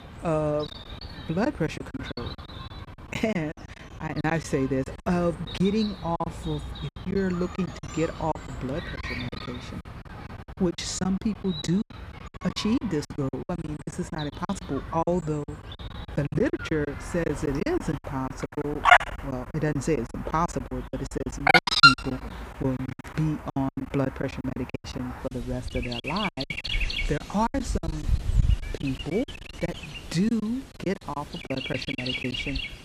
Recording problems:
animal sounds; very loud; throughout; 1 dB above the speech
choppy; very; 16% of the speech affected

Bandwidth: 15 kHz